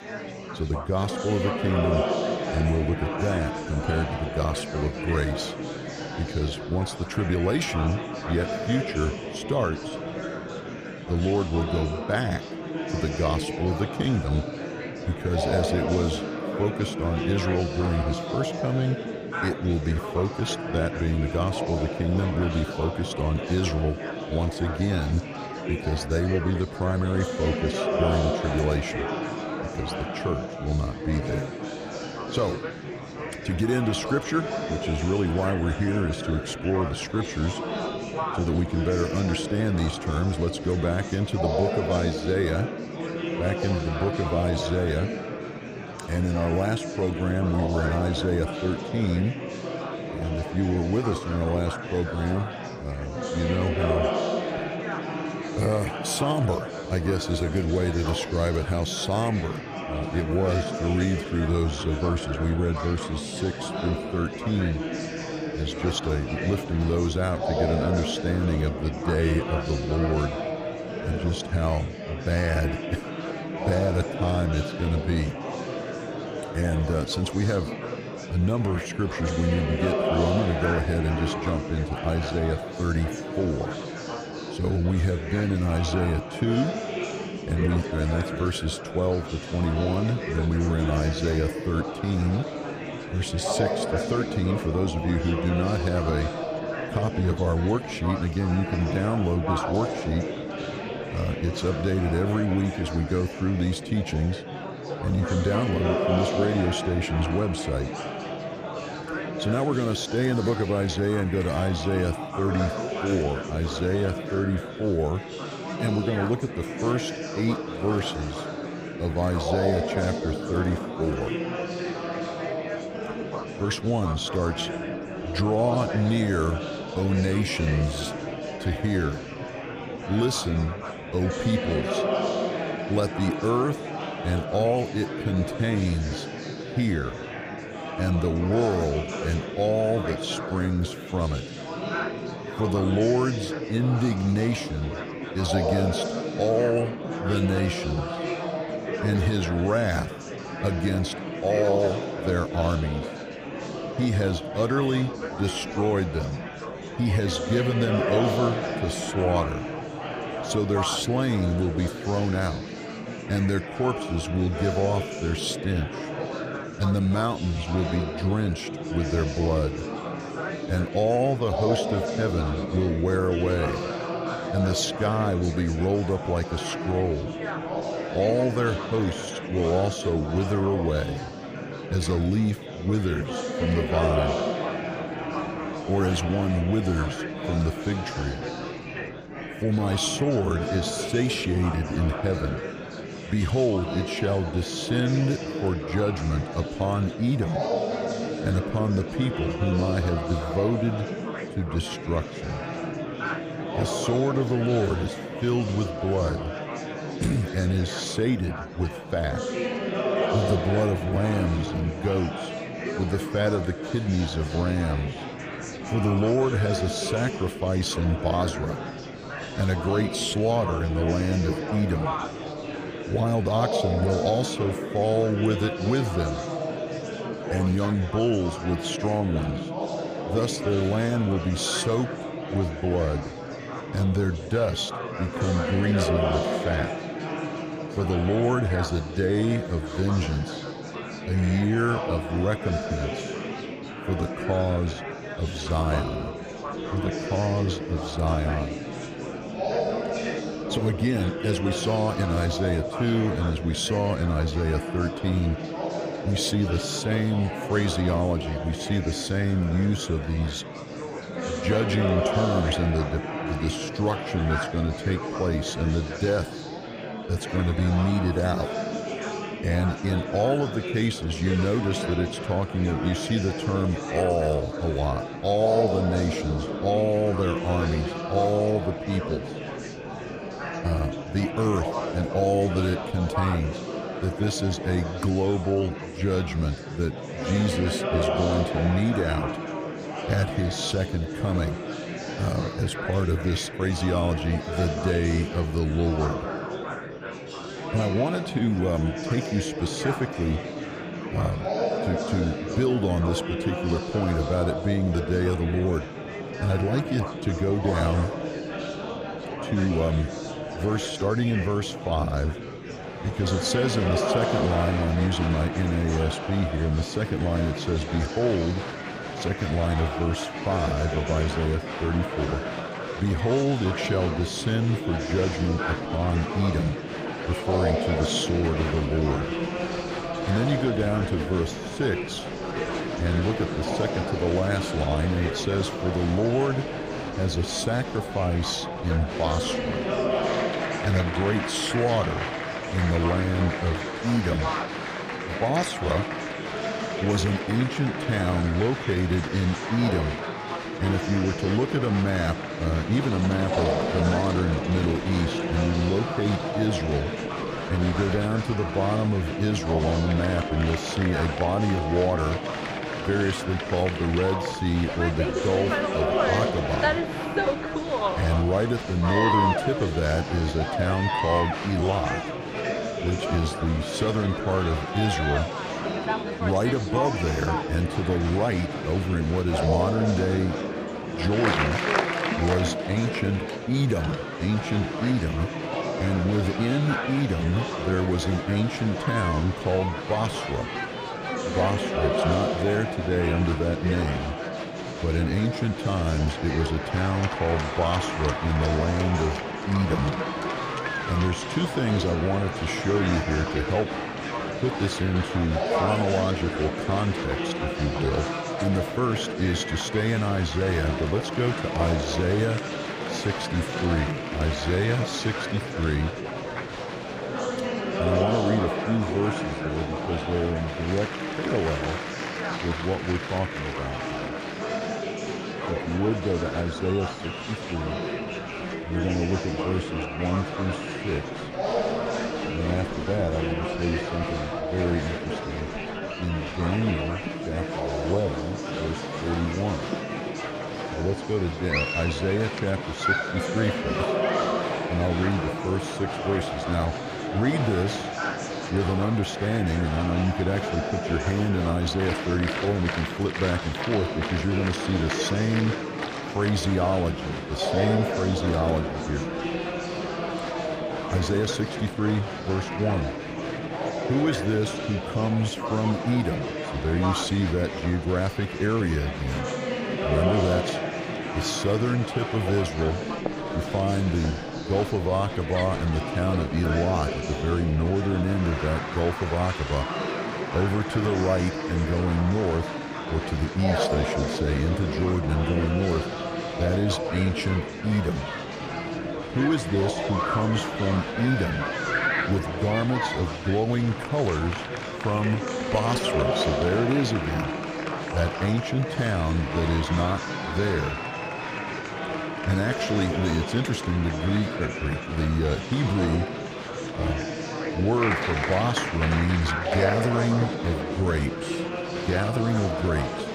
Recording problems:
murmuring crowd; loud; throughout; 4 dB below the speech

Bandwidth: 15 kHz